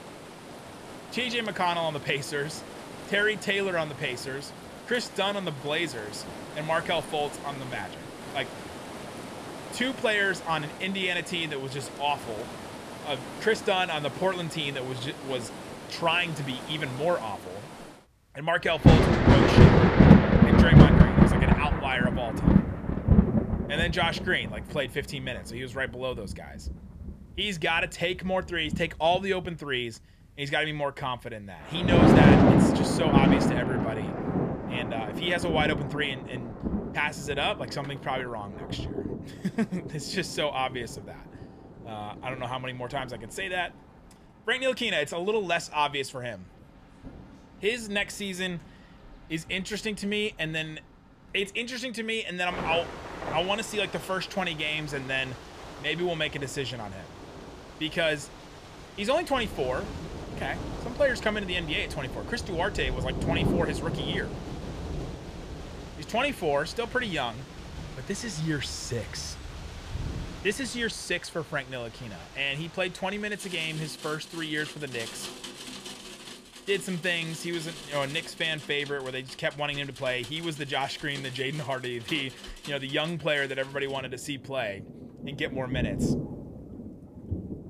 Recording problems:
rain or running water; very loud; throughout; 4 dB above the speech

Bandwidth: 14.5 kHz